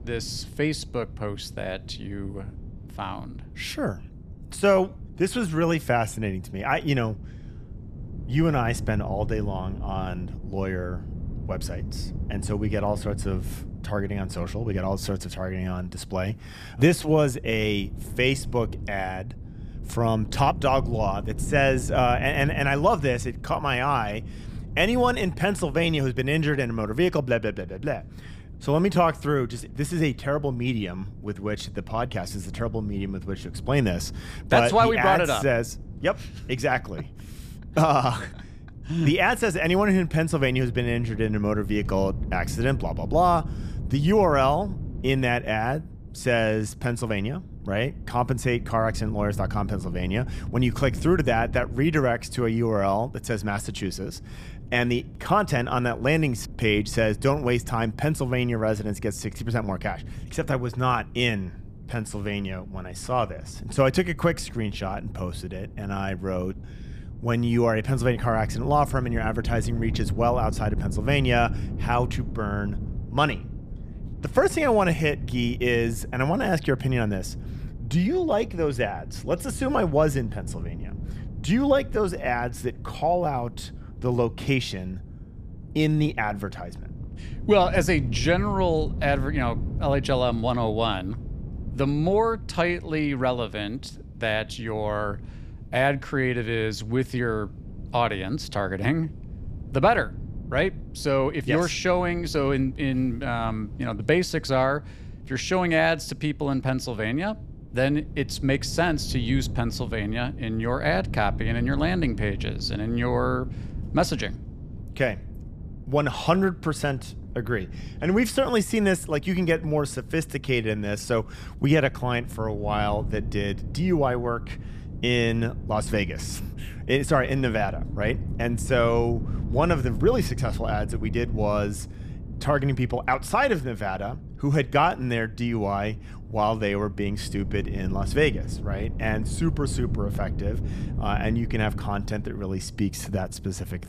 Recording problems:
wind noise on the microphone; occasional gusts; 20 dB below the speech

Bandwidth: 14.5 kHz